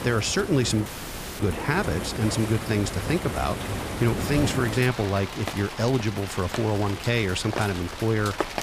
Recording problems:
rain or running water; loud; throughout; 7 dB below the speech
audio cutting out; at 1 s for 0.5 s

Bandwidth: 15 kHz